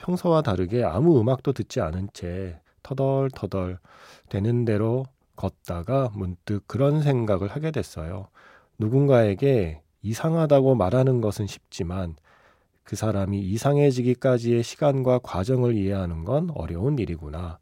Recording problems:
none

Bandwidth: 16 kHz